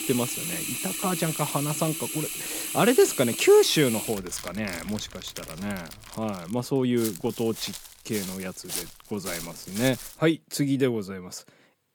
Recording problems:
household noises; loud; until 6.5 s; 5 dB below the speech
footsteps; noticeable; from 7 to 10 s; peak 6 dB below the speech

